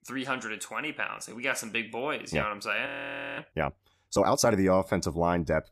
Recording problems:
audio freezing; at 3 s for 0.5 s

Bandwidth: 14.5 kHz